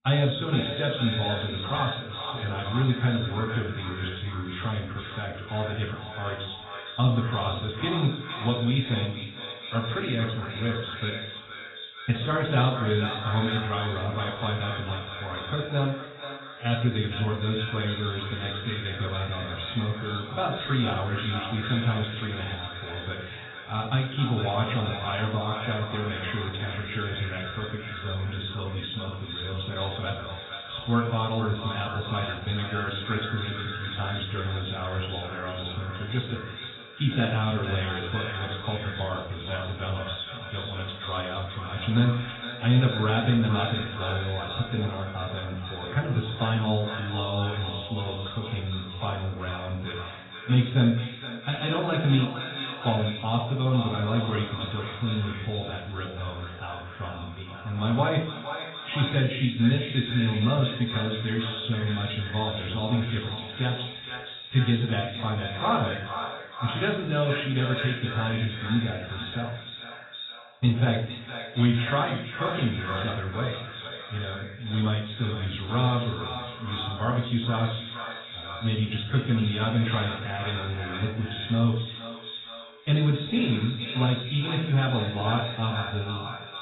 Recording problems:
echo of what is said; strong; throughout; 460 ms later, 8 dB below the speech
garbled, watery; badly; nothing above 4 kHz
room echo; slight; dies away in 0.5 s
off-mic speech; somewhat distant

